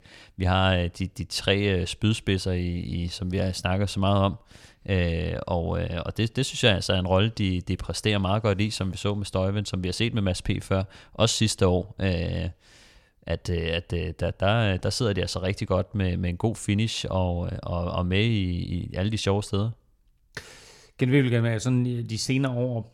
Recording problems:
none

